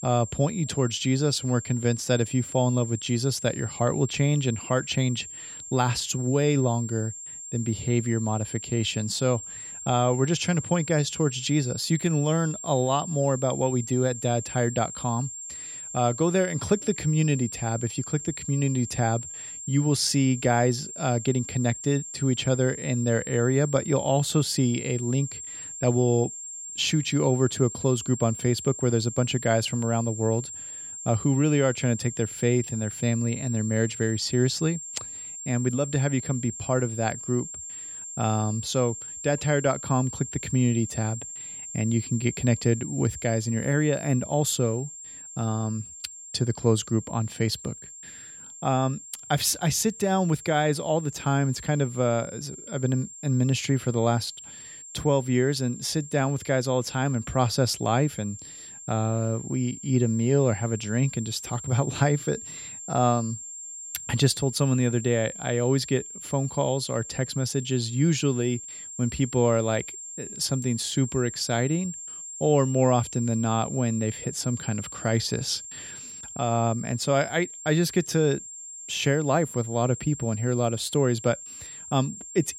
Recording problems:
high-pitched whine; noticeable; throughout; 7.5 kHz, 10 dB below the speech

